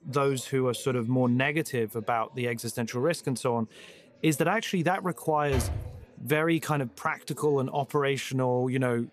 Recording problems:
chatter from many people; faint; throughout; 30 dB below the speech
door banging; noticeable; at 5.5 s; peak 4 dB below the speech

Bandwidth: 14.5 kHz